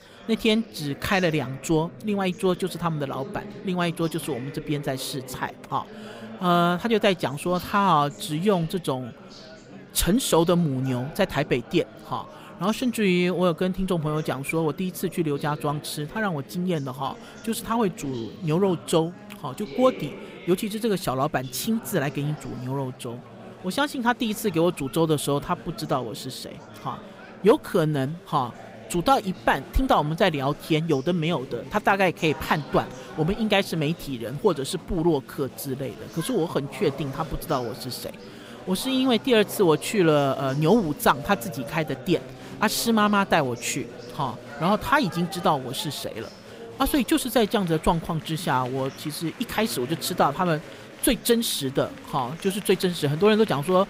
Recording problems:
murmuring crowd; noticeable; throughout; 15 dB below the speech

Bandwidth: 15.5 kHz